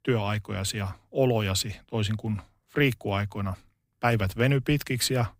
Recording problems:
none

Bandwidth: 15.5 kHz